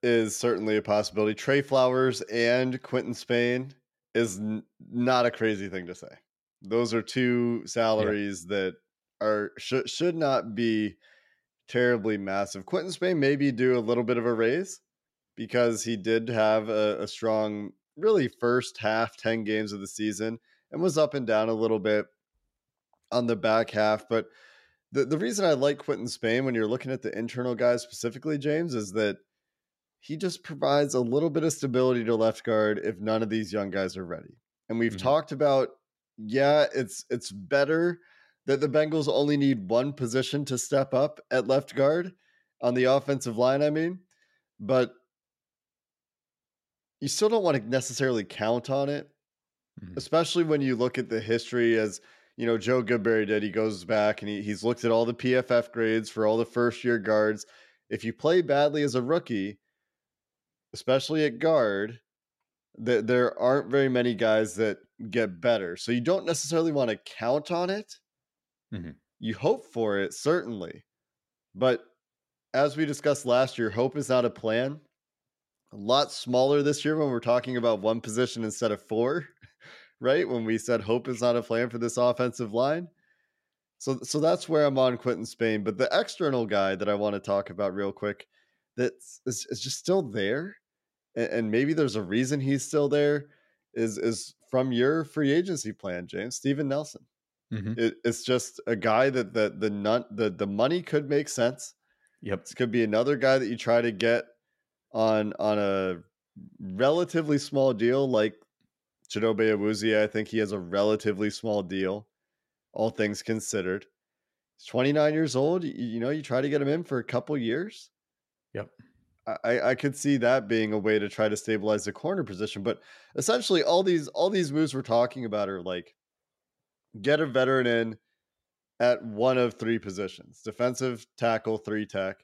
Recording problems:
none

